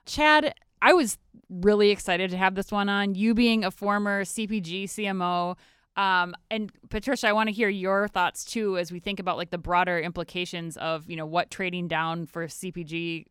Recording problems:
none

